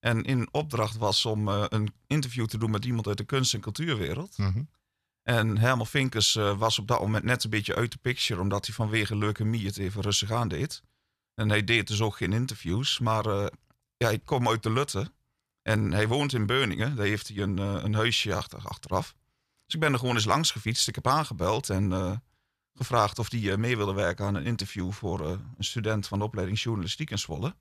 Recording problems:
none

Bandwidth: 14 kHz